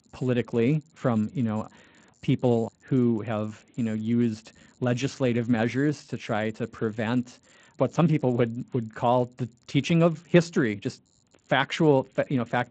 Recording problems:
garbled, watery; slightly; nothing above 7.5 kHz
high-pitched whine; very faint; throughout; 7 kHz, 50 dB below the speech

